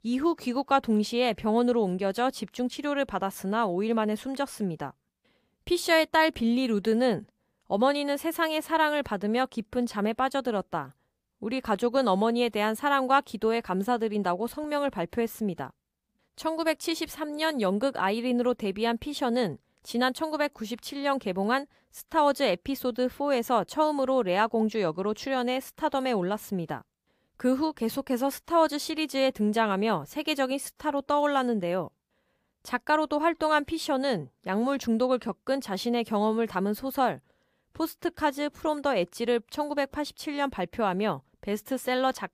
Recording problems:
none

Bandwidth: 15 kHz